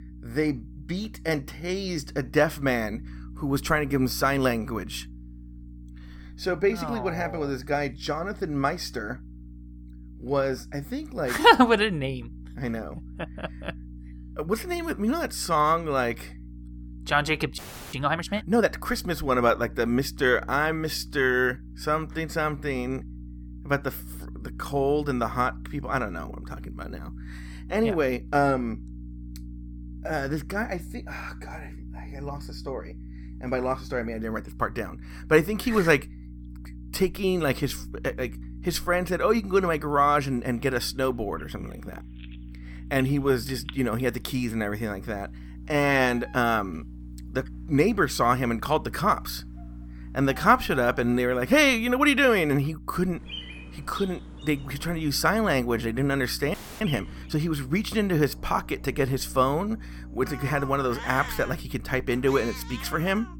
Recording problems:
animal sounds; noticeable; from 40 s on; 15 dB below the speech
electrical hum; faint; throughout; 60 Hz, 25 dB below the speech
audio freezing; at 18 s and at 57 s

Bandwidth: 17.5 kHz